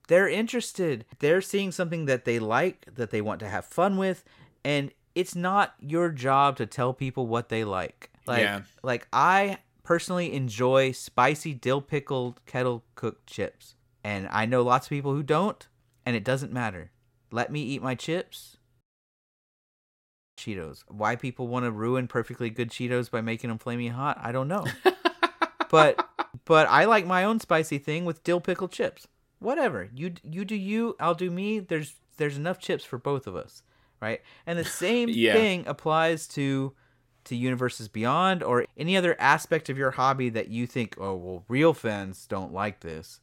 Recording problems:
audio cutting out; at 19 s for 1.5 s

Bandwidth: 16 kHz